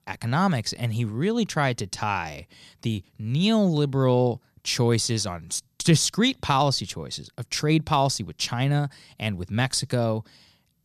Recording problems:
none

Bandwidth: 14 kHz